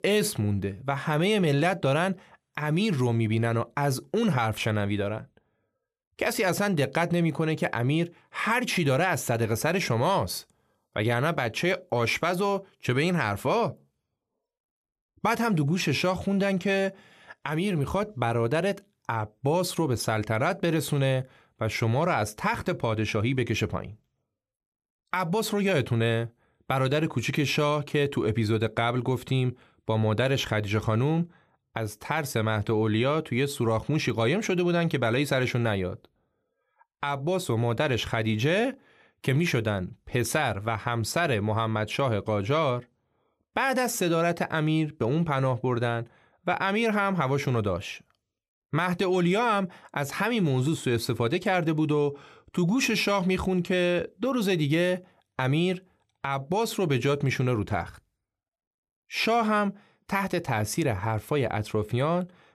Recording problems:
none

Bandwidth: 14 kHz